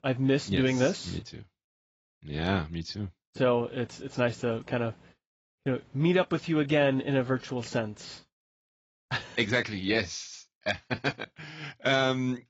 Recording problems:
garbled, watery; badly; nothing above 7.5 kHz

